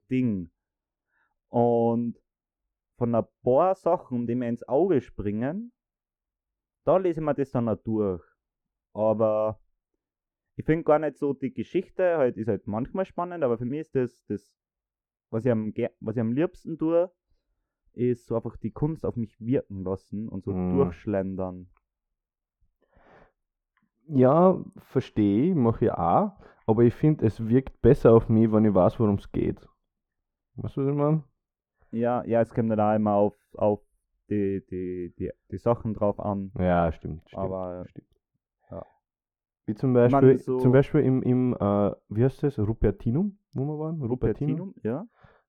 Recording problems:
muffled; very; fading above 2 kHz

